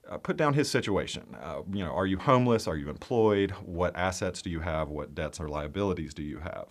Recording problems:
none

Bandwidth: 14.5 kHz